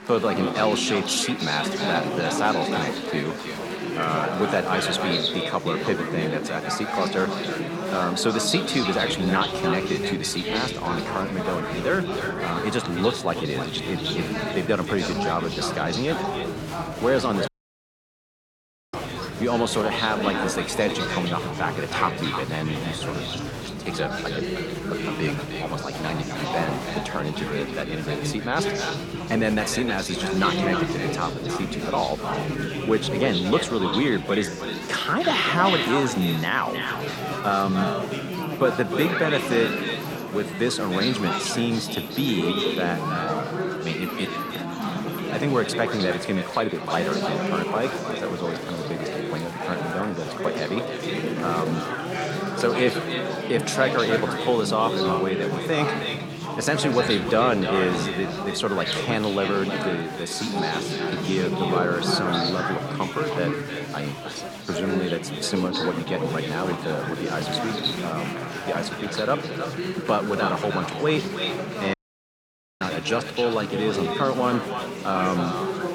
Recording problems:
echo of what is said; strong; throughout; 310 ms later, 7 dB below the speech
chatter from many people; loud; throughout; 3 dB below the speech
audio cutting out; at 17 s for 1.5 s and at 1:12 for 1 s

